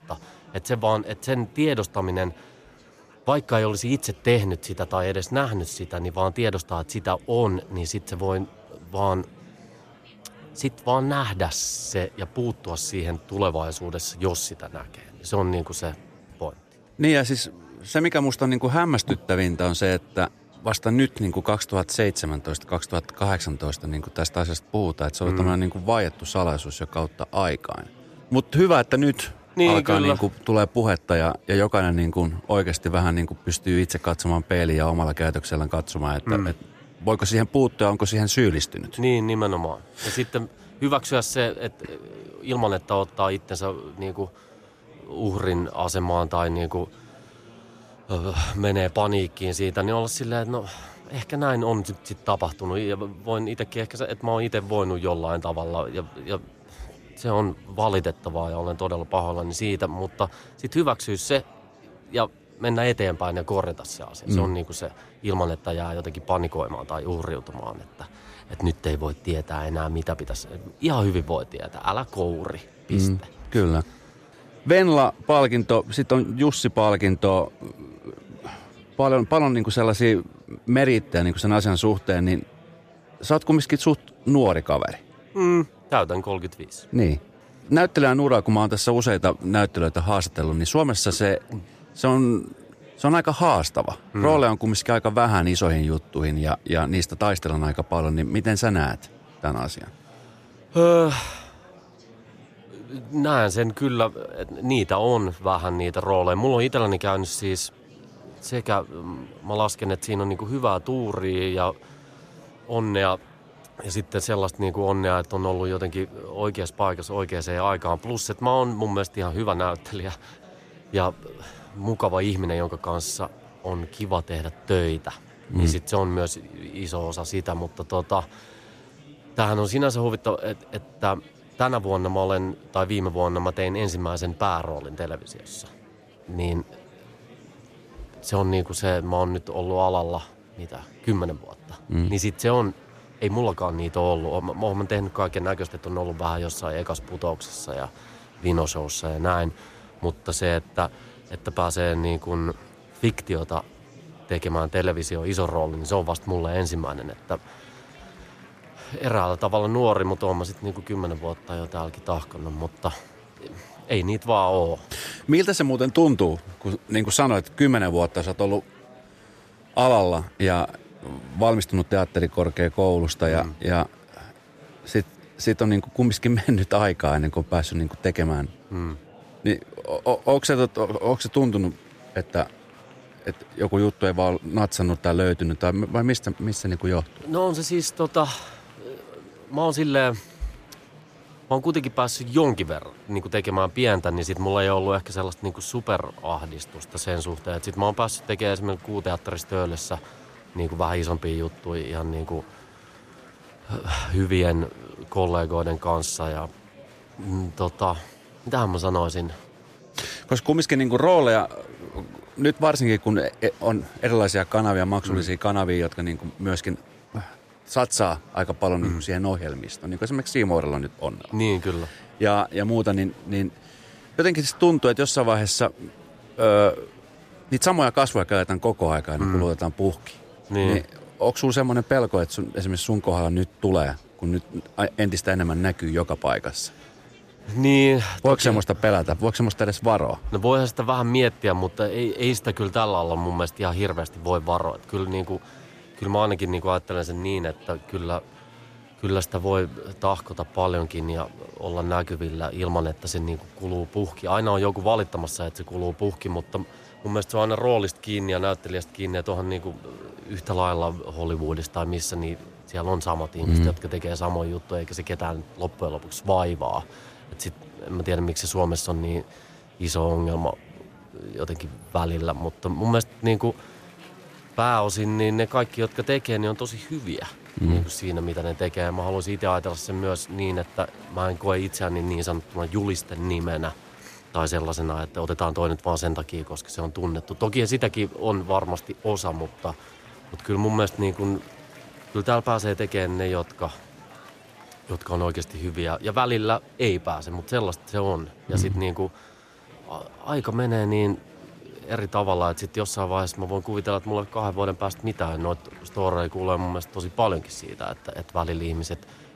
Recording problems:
murmuring crowd; faint; throughout; 25 dB below the speech

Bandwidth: 14.5 kHz